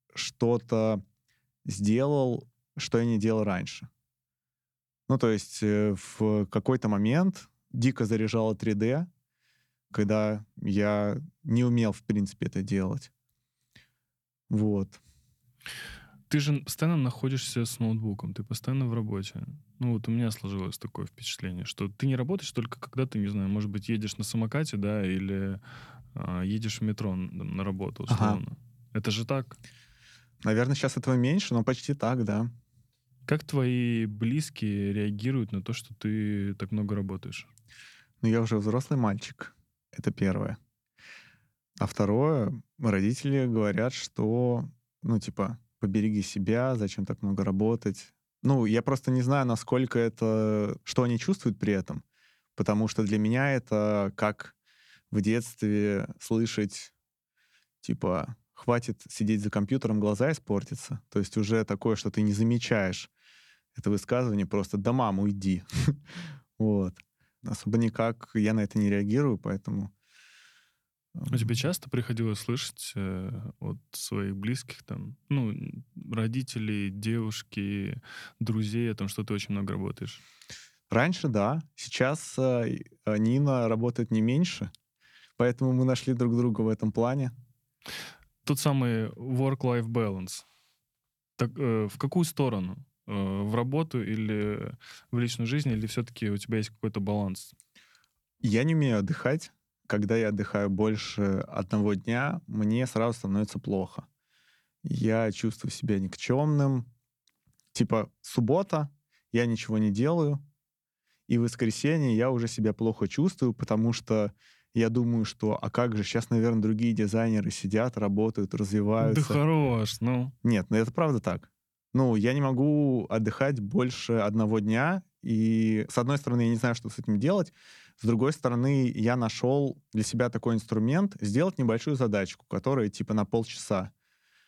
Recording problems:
none

